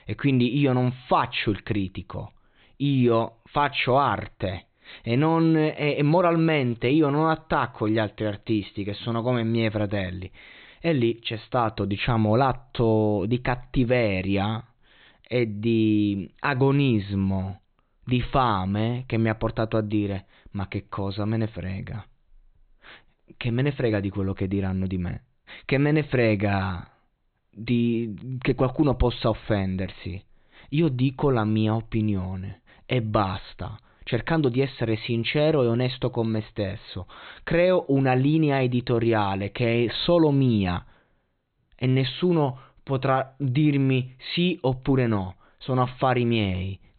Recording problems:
high frequencies cut off; severe; nothing above 4 kHz

